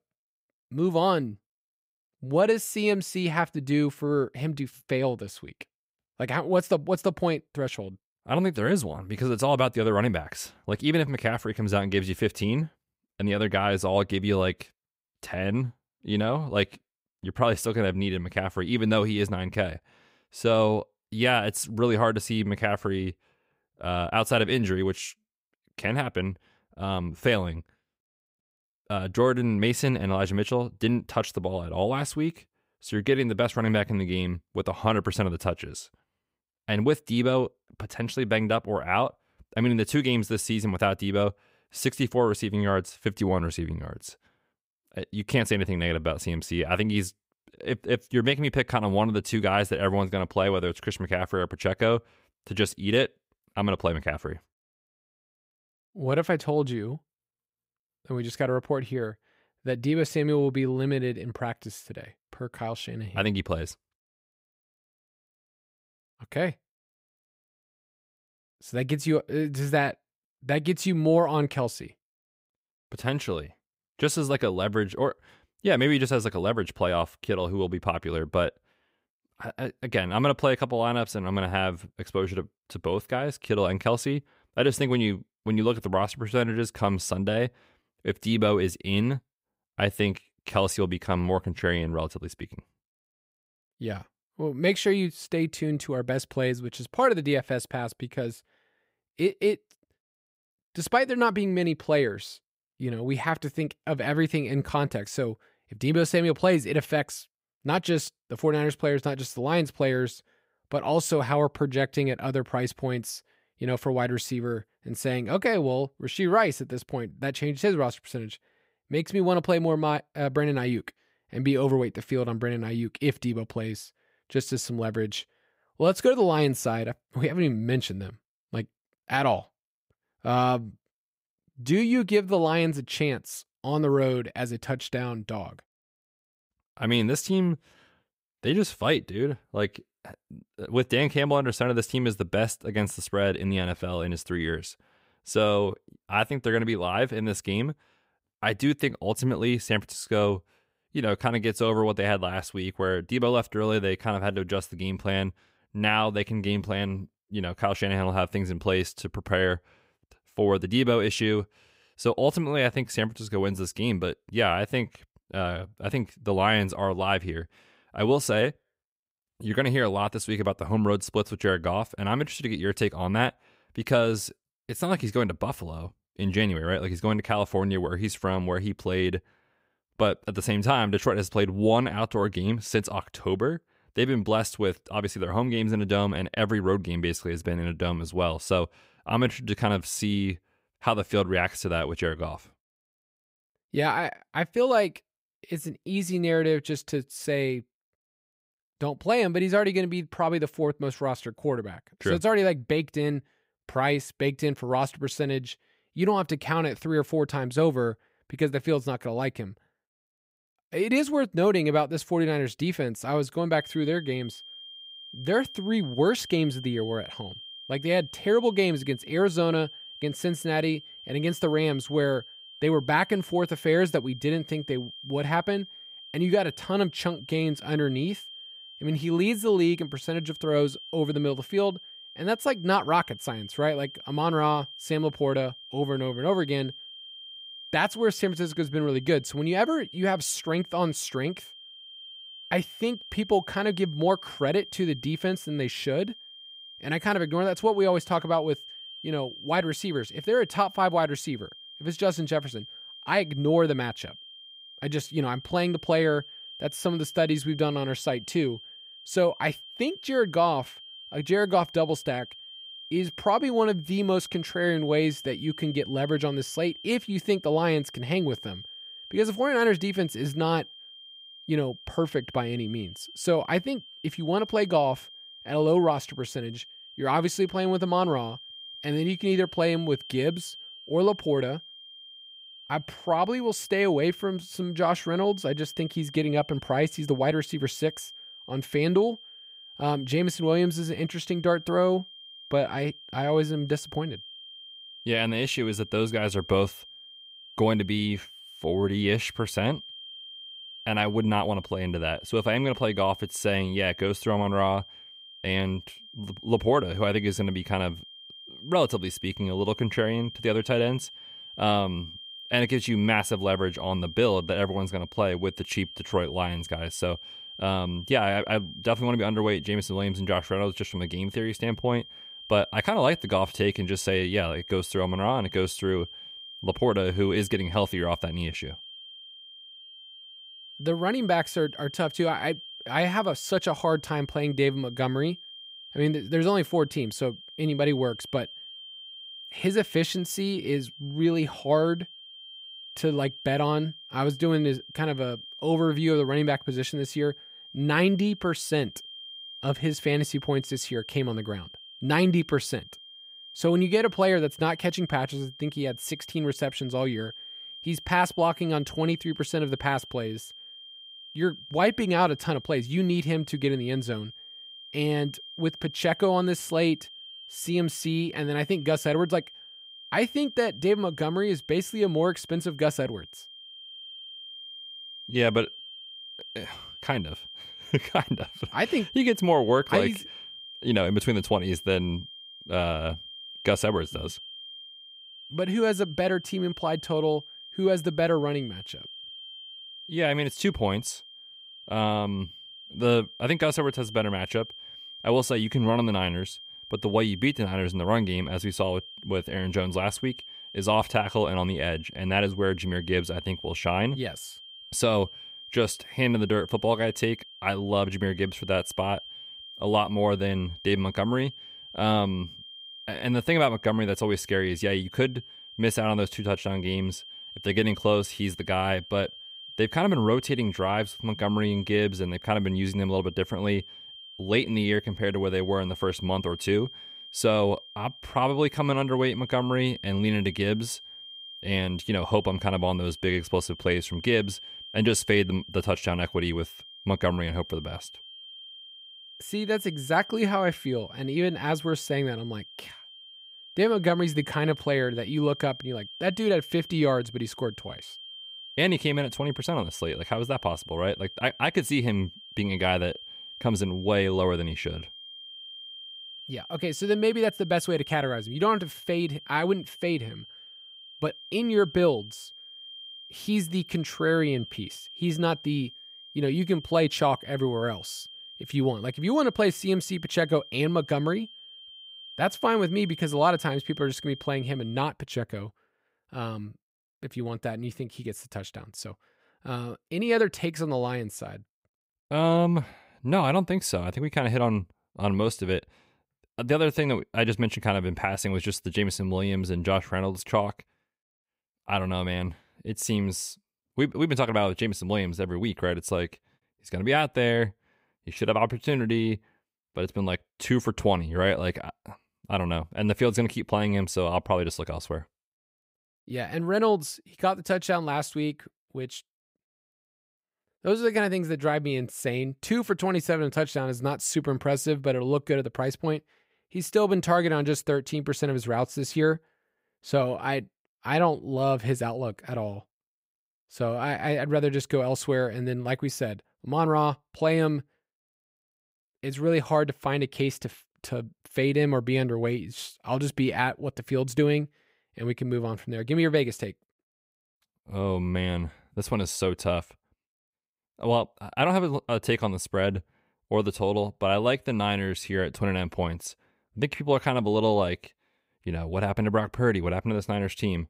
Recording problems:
high-pitched whine; noticeable; from 3:34 to 7:55; 3 kHz, 15 dB below the speech

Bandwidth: 15.5 kHz